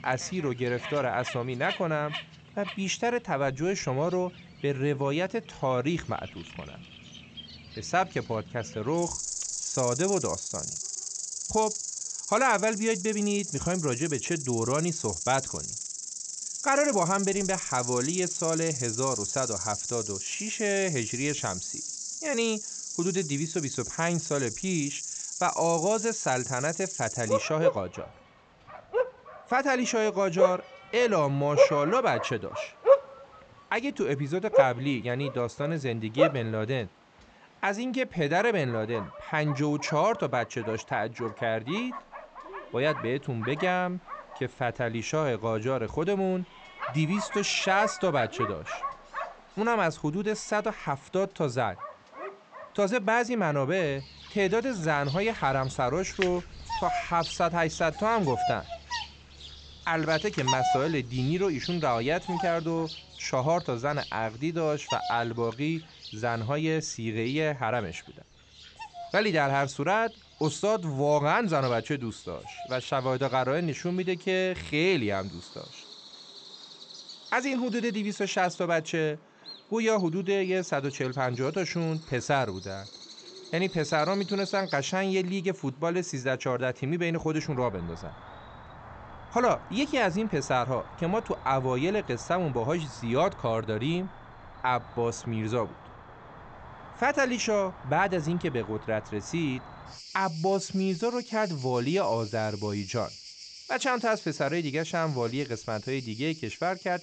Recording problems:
high frequencies cut off; noticeable; nothing above 8 kHz
animal sounds; loud; throughout; 6 dB below the speech

